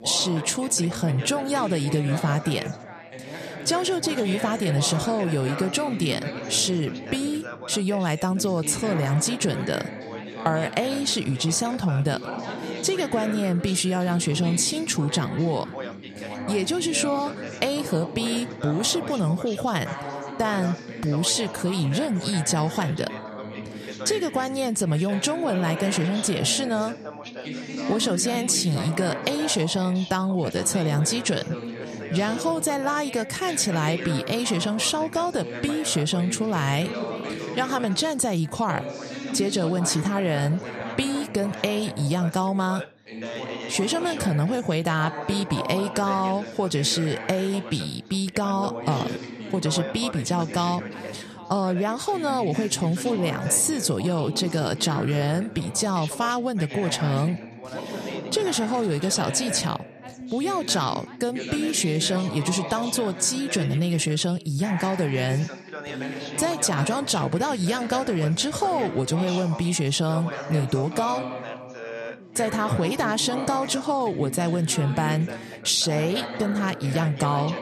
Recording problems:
background chatter; loud; throughout; 3 voices, 10 dB below the speech

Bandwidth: 14 kHz